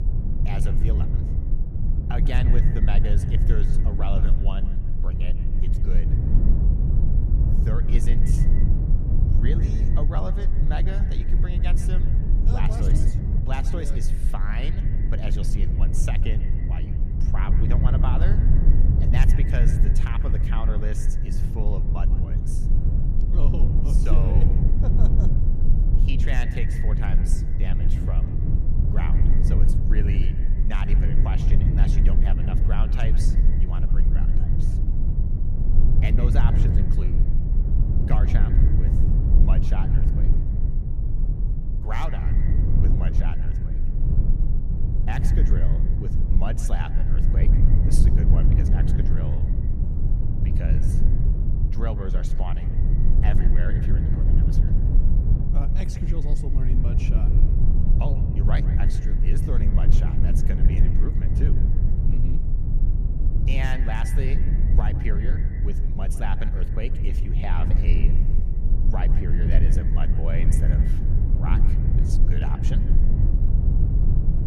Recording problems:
echo of what is said; noticeable; throughout; 150 ms later, 15 dB below the speech
low rumble; loud; throughout; as loud as the speech

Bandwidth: 14 kHz